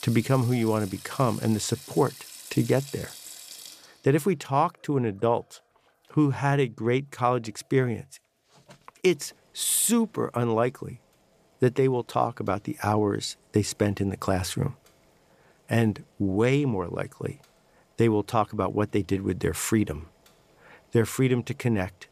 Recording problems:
household noises; noticeable; throughout; 15 dB below the speech

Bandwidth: 14.5 kHz